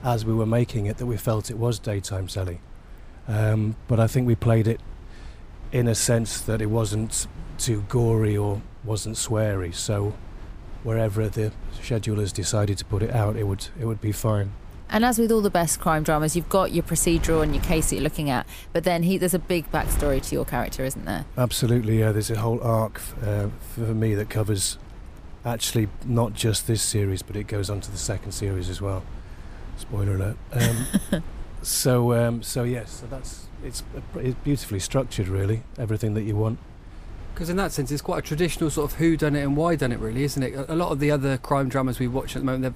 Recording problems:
wind noise on the microphone; occasional gusts; 20 dB below the speech

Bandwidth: 15 kHz